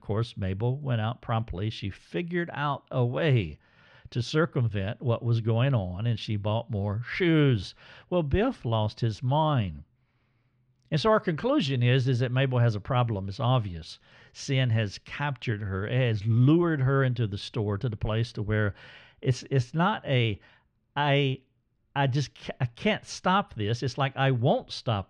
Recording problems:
muffled; slightly; fading above 2.5 kHz

